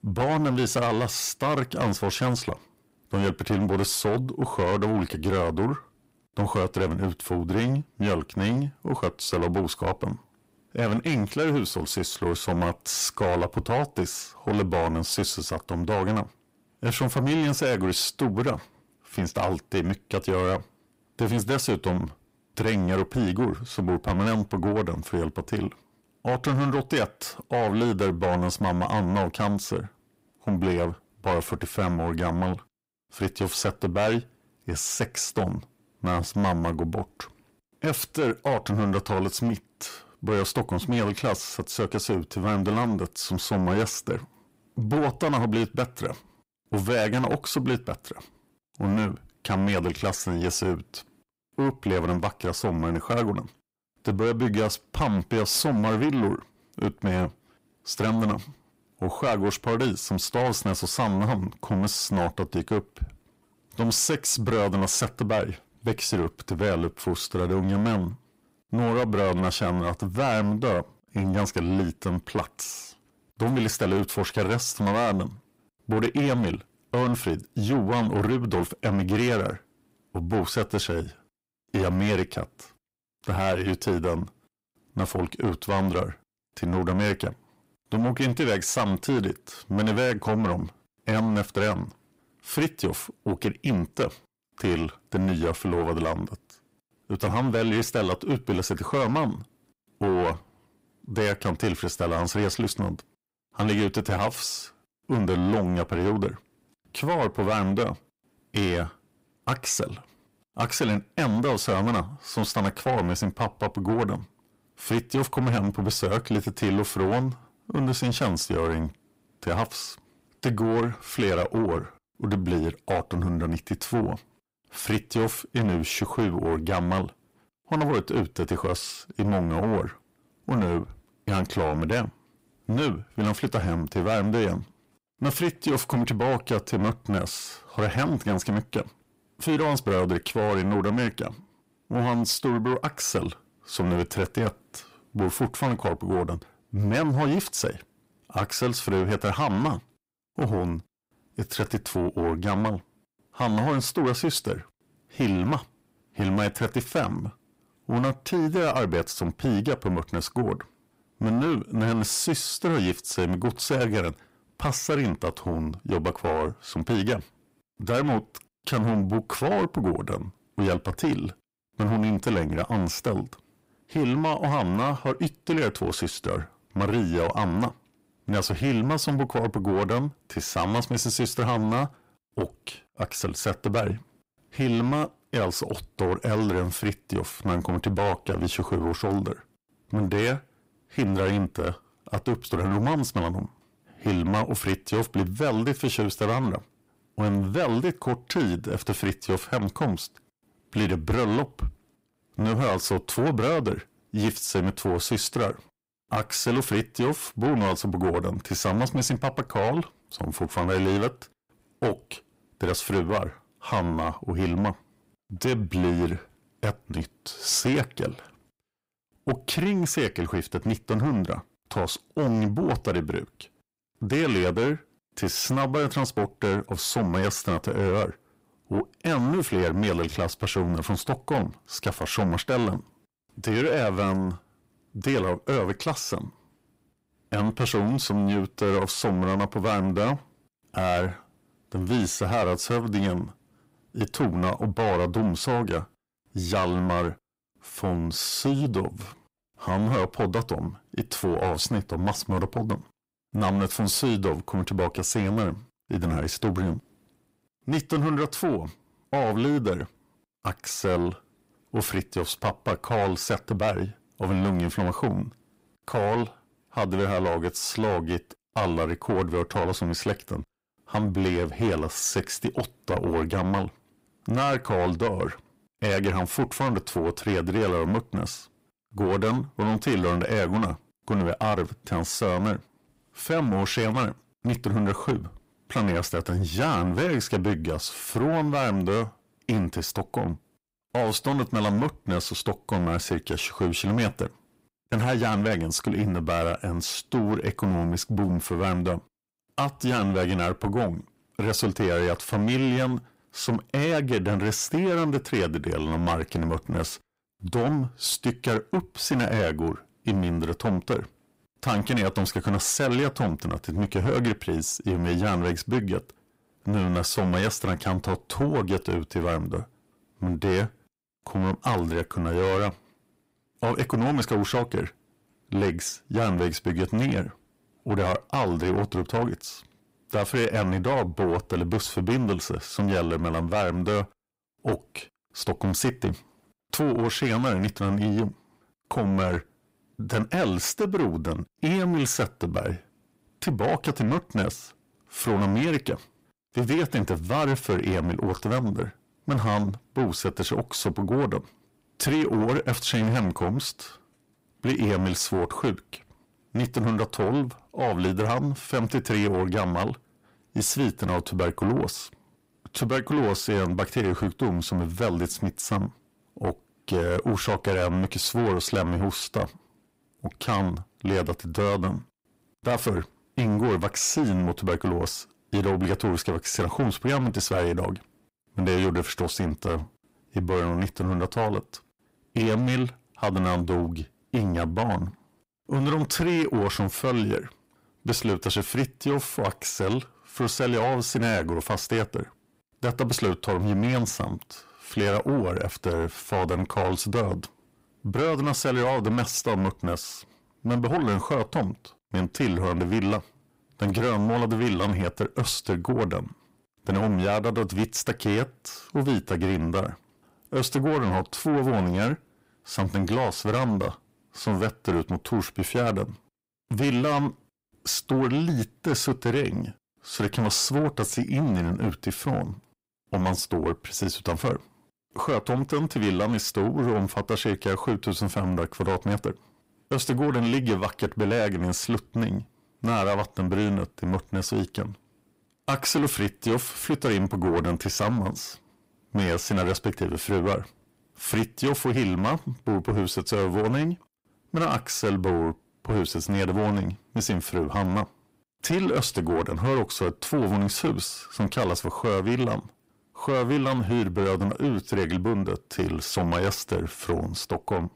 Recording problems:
distortion; heavy; 7 dB below the speech

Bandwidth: 15.5 kHz